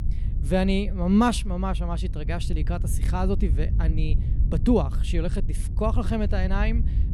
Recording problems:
low rumble; noticeable; throughout; 15 dB below the speech

